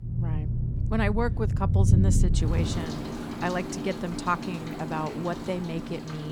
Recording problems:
rain or running water; very loud; throughout; 3 dB above the speech
abrupt cut into speech; at the end

